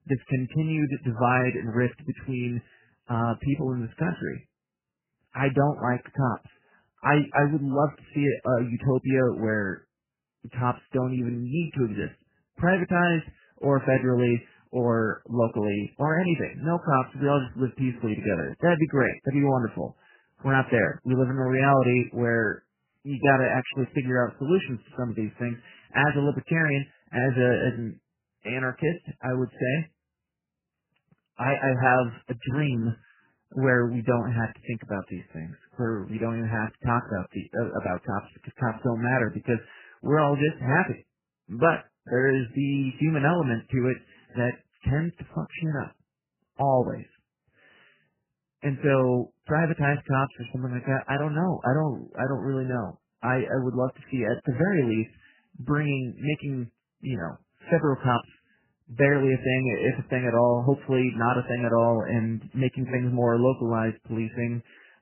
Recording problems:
garbled, watery; badly; nothing above 3 kHz

